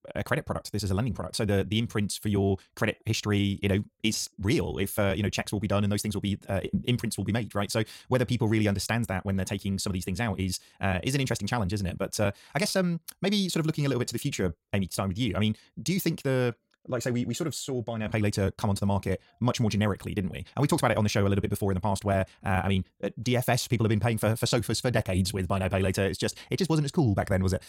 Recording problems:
wrong speed, natural pitch; too fast; 1.6 times normal speed

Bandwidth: 16.5 kHz